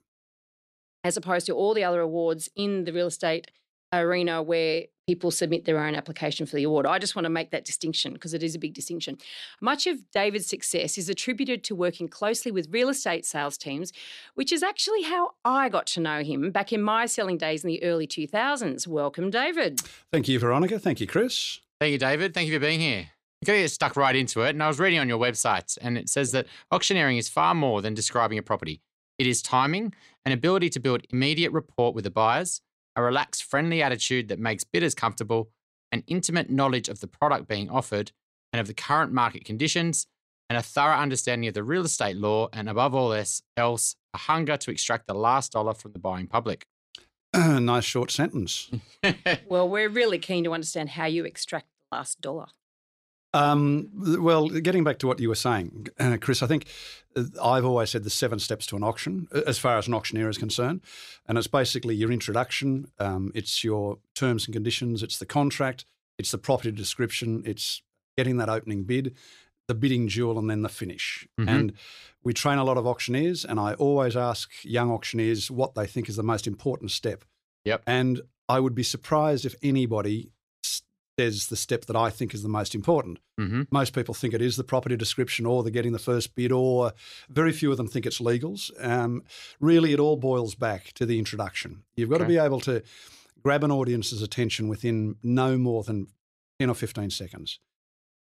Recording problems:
none

